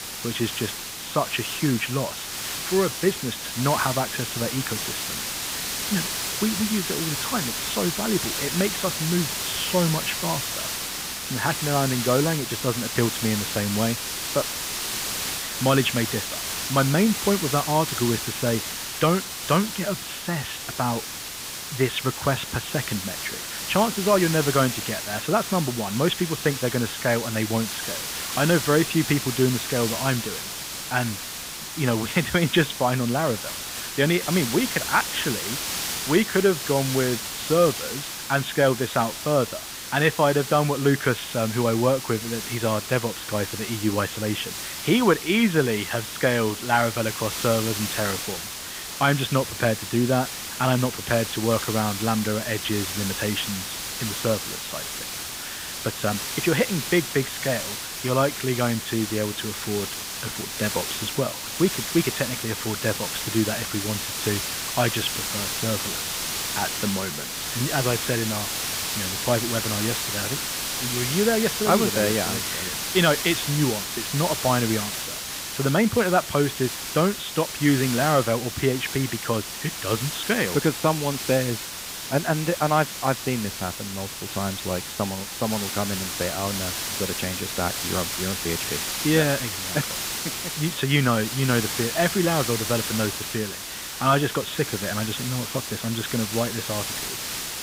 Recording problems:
high frequencies cut off; severe; nothing above 4 kHz
hiss; loud; throughout; 3 dB below the speech

